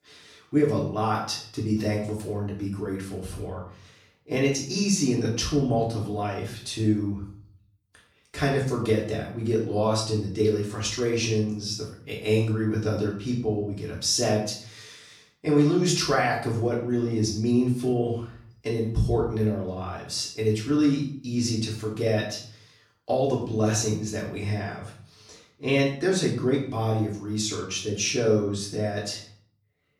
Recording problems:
off-mic speech; far
room echo; noticeable; dies away in 0.5 s

